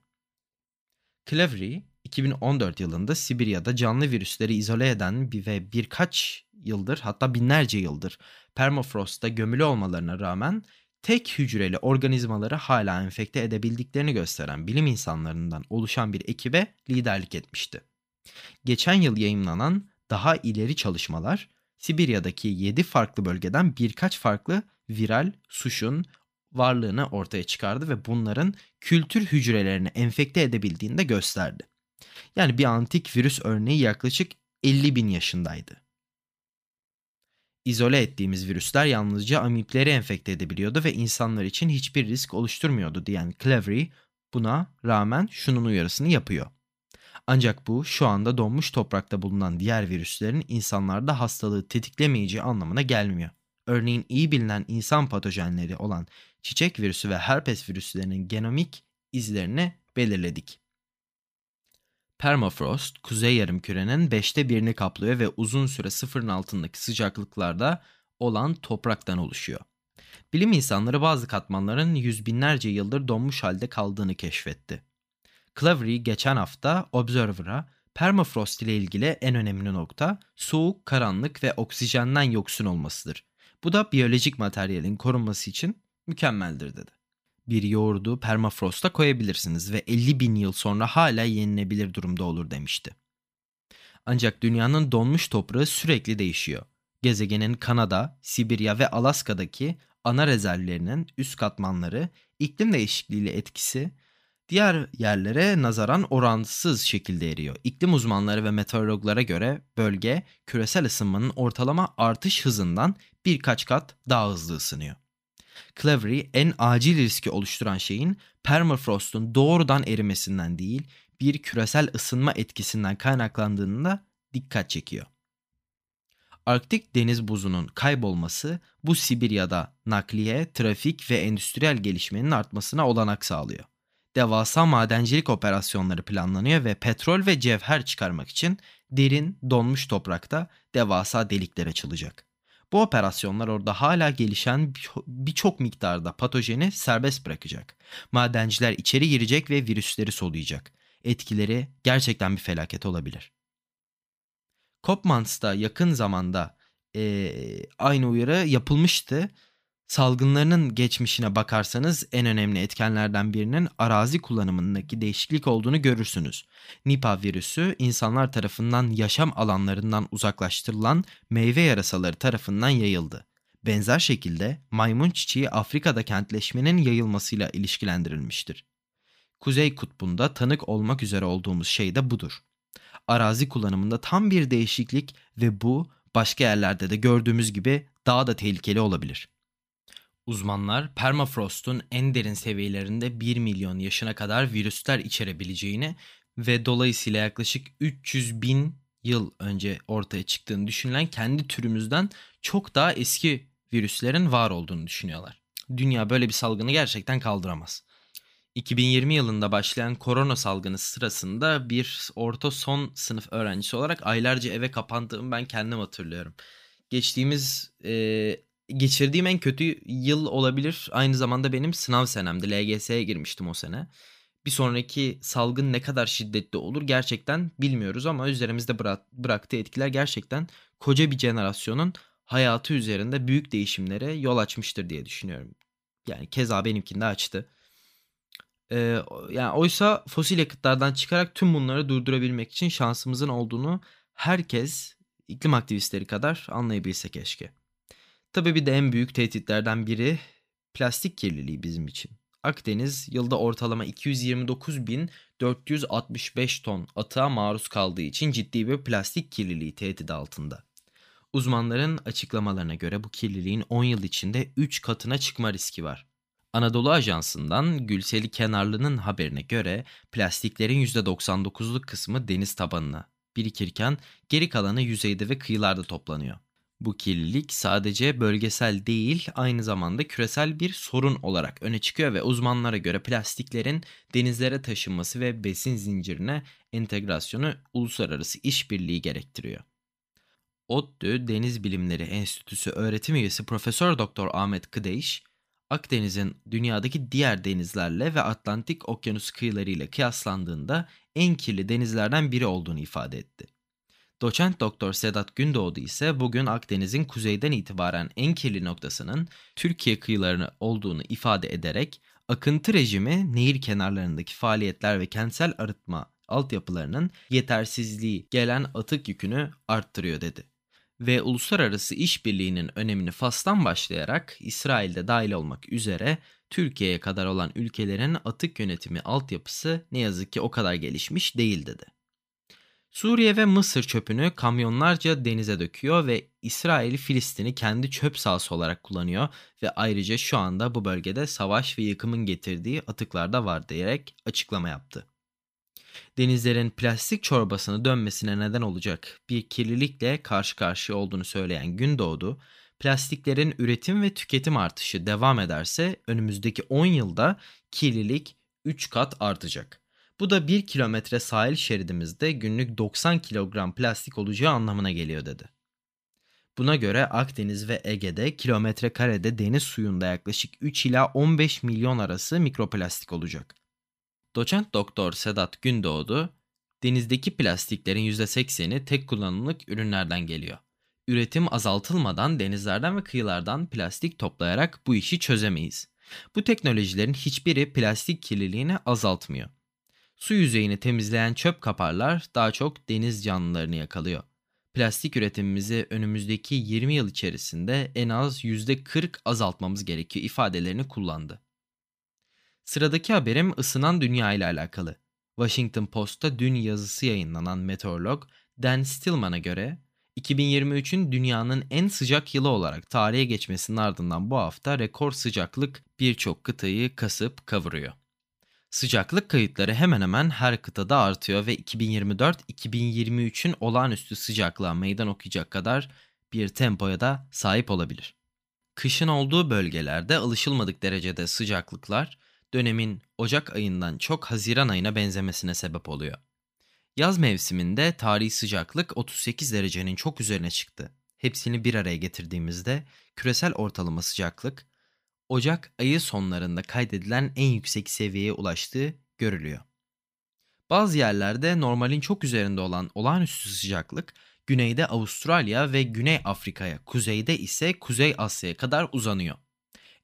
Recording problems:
none

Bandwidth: 15 kHz